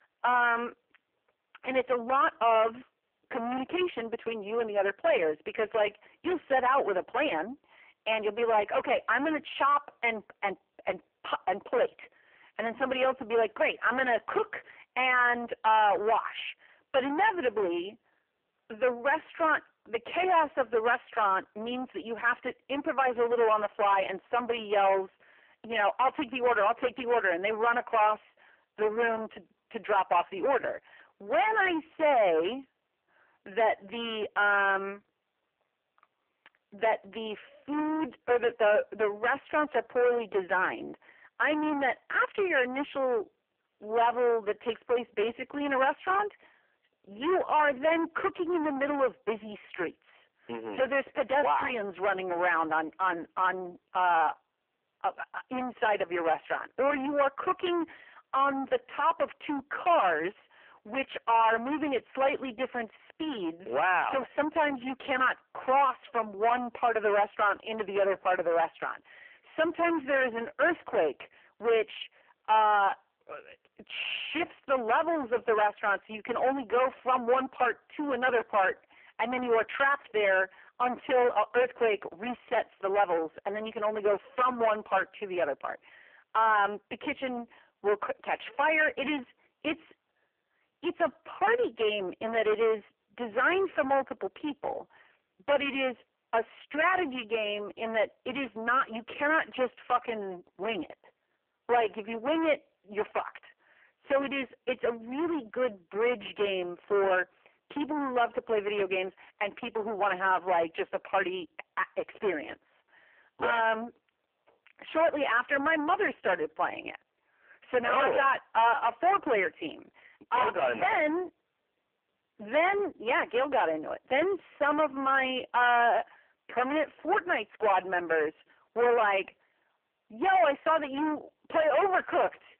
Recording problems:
phone-call audio; poor line; nothing above 3 kHz
distortion; heavy; 8 dB below the speech

